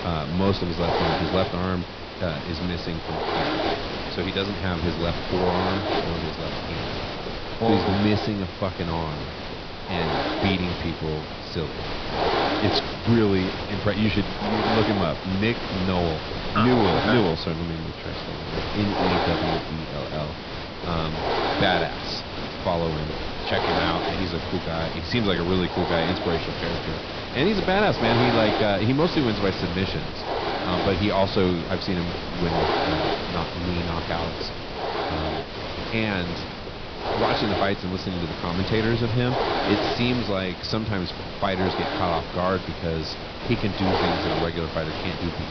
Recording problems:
high frequencies cut off; noticeable; nothing above 5.5 kHz
hiss; loud; throughout; 2 dB below the speech

